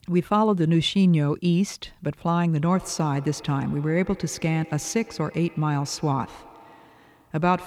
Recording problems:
echo of what is said; faint; from 2.5 s on; 110 ms later, 20 dB below the speech

